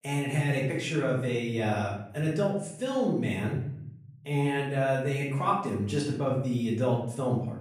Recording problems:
off-mic speech; far
room echo; noticeable; dies away in 0.8 s

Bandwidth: 14.5 kHz